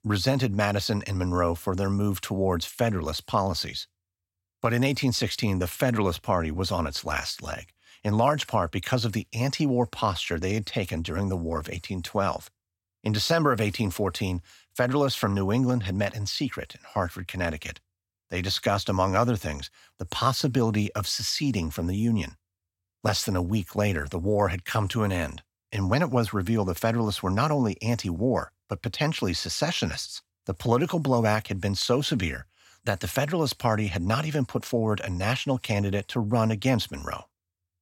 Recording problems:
none

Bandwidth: 16.5 kHz